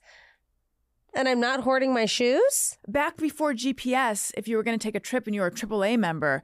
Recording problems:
none

